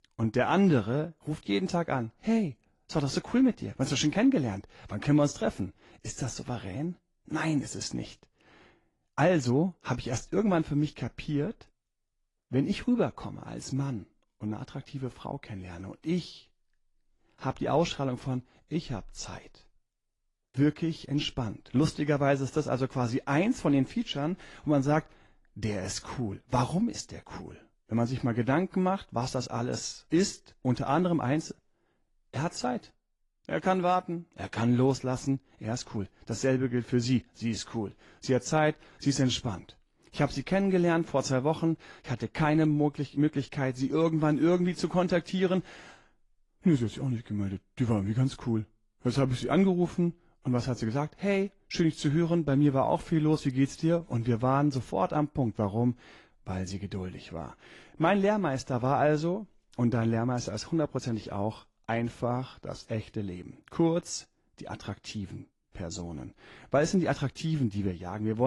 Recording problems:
garbled, watery; slightly; nothing above 10.5 kHz
abrupt cut into speech; at the end

